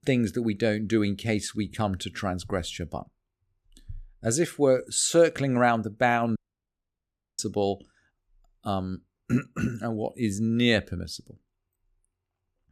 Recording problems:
audio cutting out; at 6.5 s for 1 s

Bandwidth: 14.5 kHz